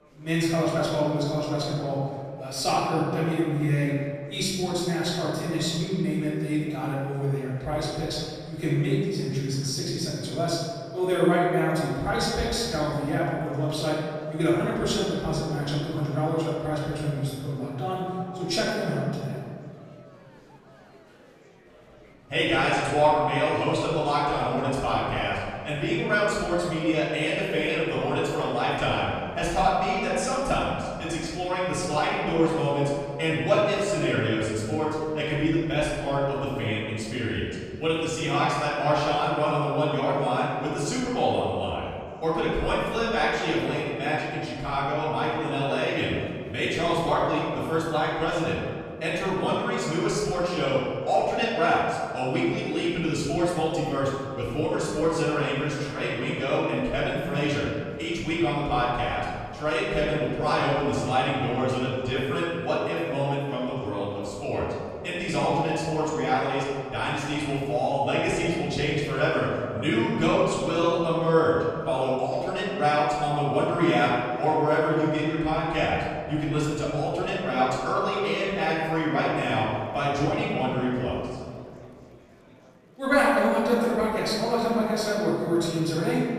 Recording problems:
room echo; strong; dies away in 1.9 s
off-mic speech; far
murmuring crowd; faint; throughout; 25 dB below the speech

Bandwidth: 14.5 kHz